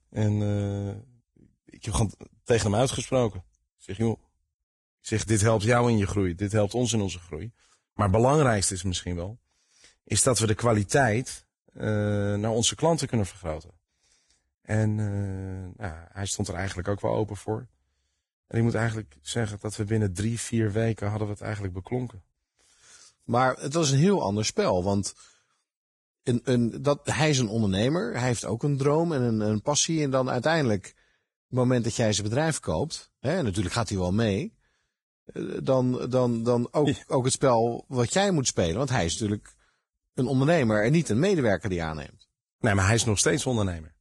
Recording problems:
garbled, watery; badly; nothing above 10.5 kHz

